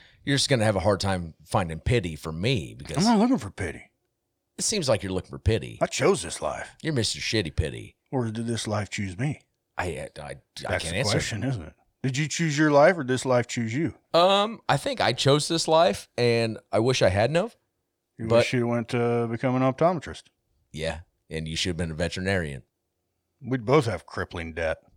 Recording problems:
none

